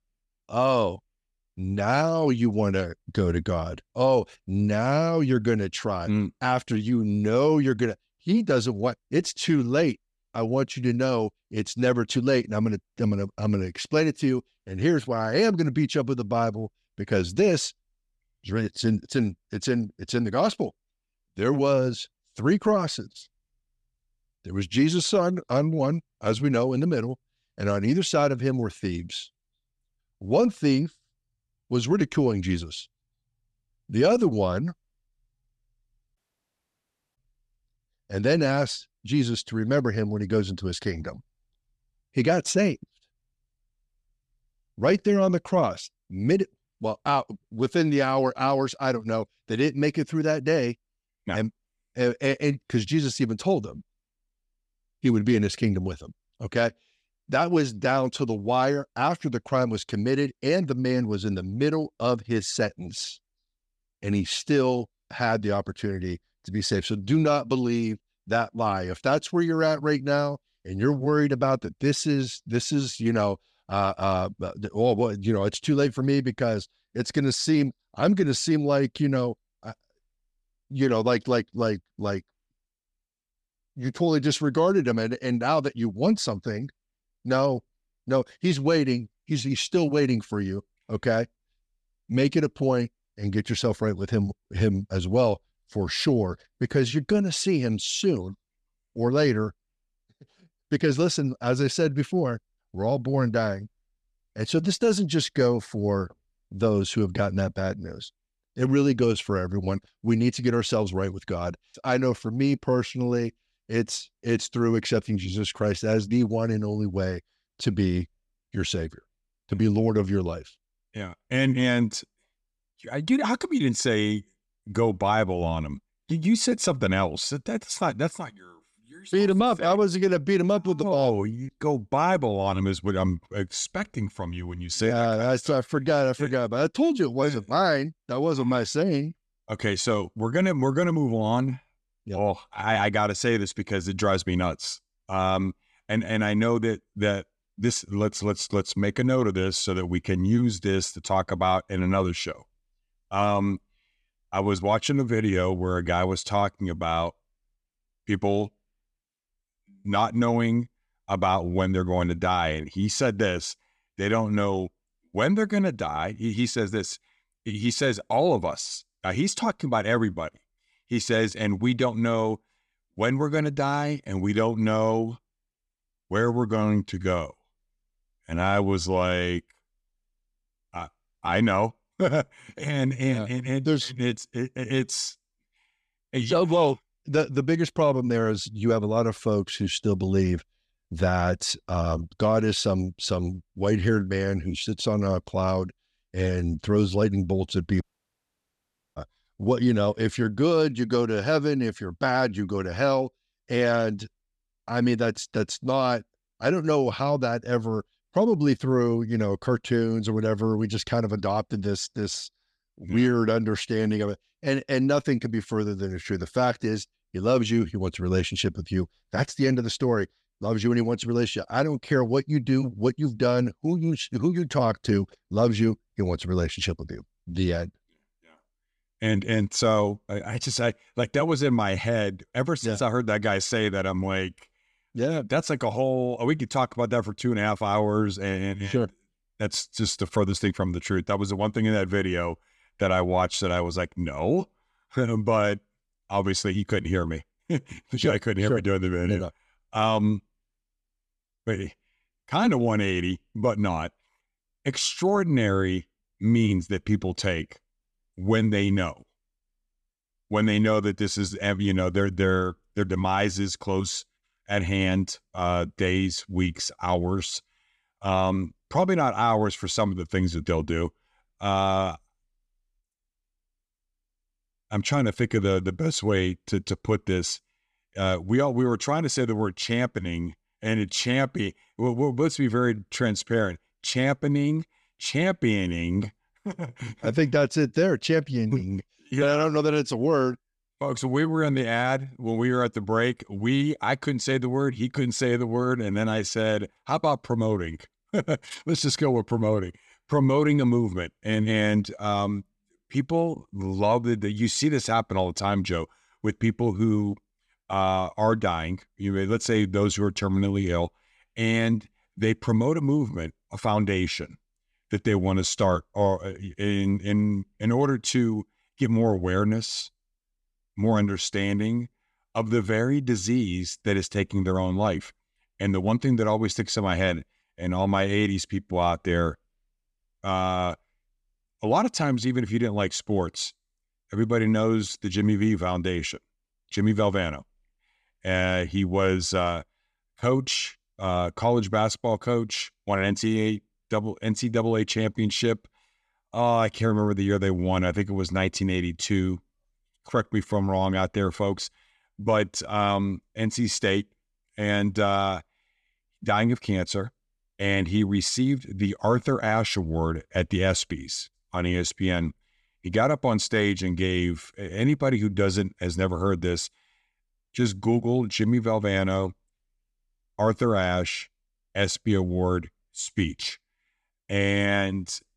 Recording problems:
audio cutting out; at 36 s for 1 s and at 3:18 for 1 s

